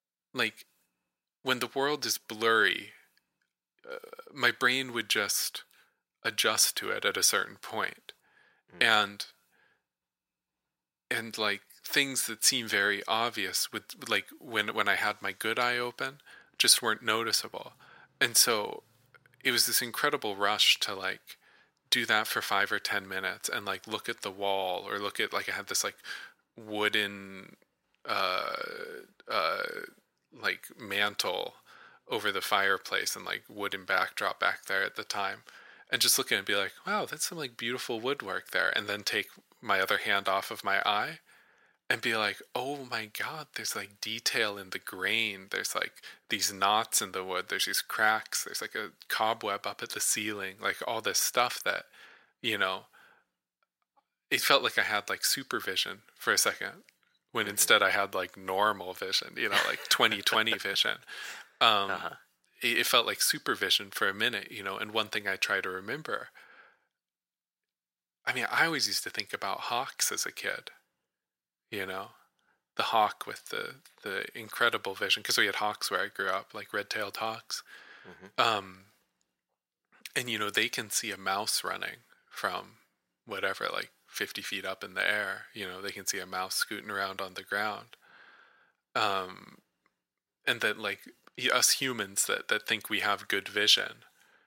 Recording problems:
thin; very; fading below 650 Hz

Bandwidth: 16 kHz